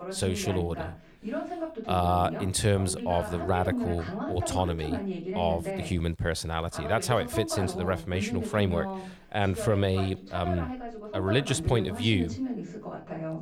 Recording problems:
voice in the background; loud; throughout; 6 dB below the speech

